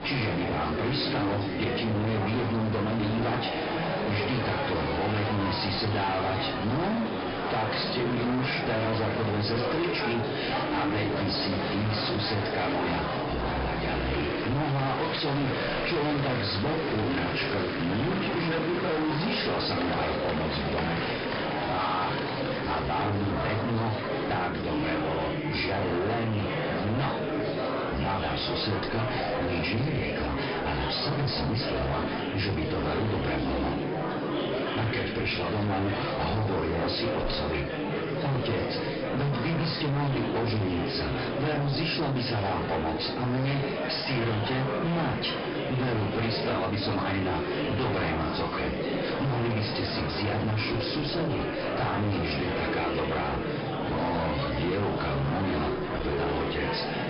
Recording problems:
distortion; heavy; 34% of the sound clipped
off-mic speech; far
high frequencies cut off; noticeable; nothing above 5 kHz
room echo; slight; dies away in 0.3 s
murmuring crowd; loud; throughout; 1 dB below the speech

